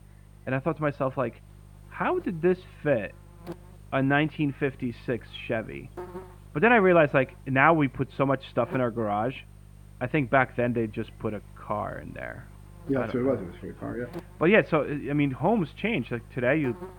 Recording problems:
muffled; very; fading above 2.5 kHz
electrical hum; faint; throughout; 50 Hz, 25 dB below the speech

